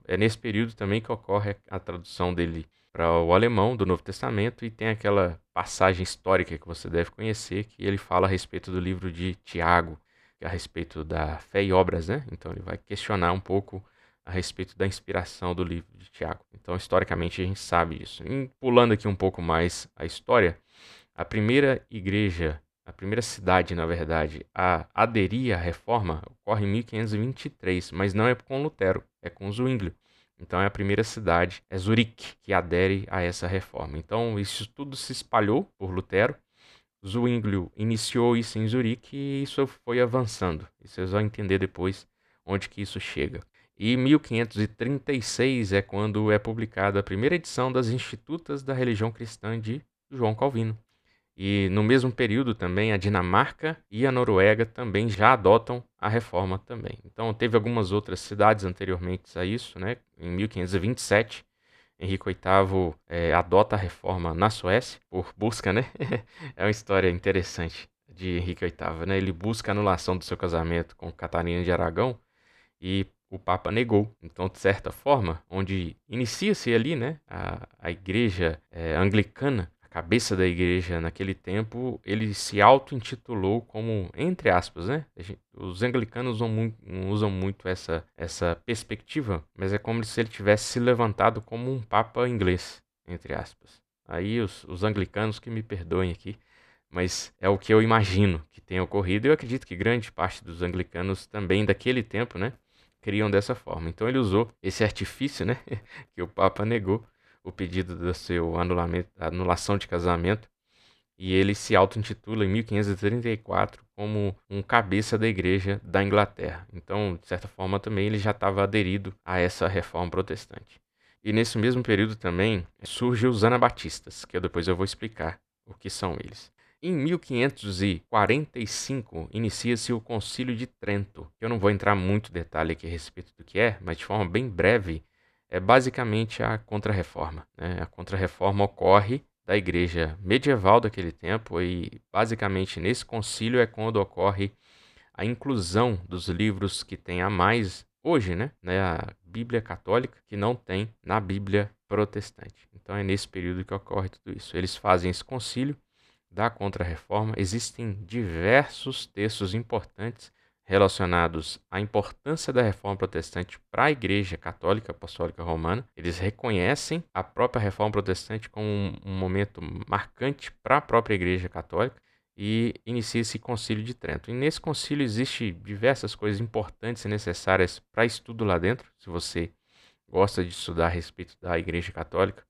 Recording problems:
none

